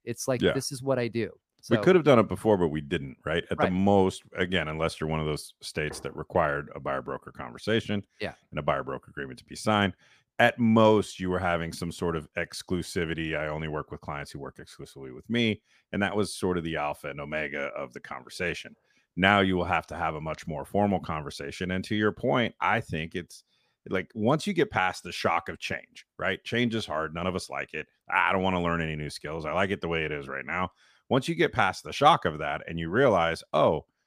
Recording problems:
none

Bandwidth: 15 kHz